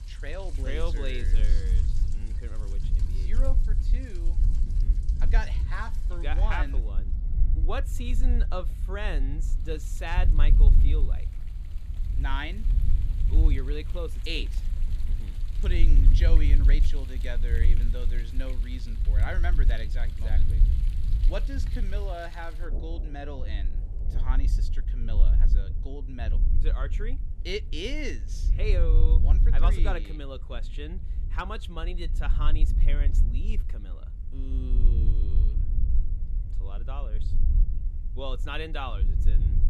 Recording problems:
rain or running water; noticeable; throughout; 15 dB below the speech
low rumble; noticeable; throughout; 10 dB below the speech

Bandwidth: 15 kHz